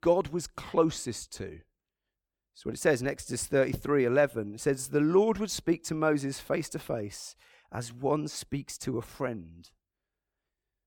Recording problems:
none

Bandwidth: 18 kHz